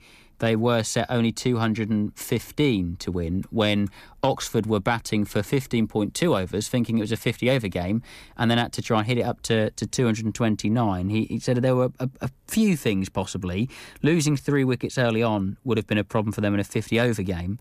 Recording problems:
none

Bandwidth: 14.5 kHz